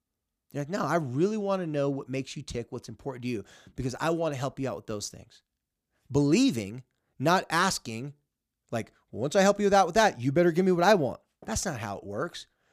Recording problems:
none

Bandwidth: 15 kHz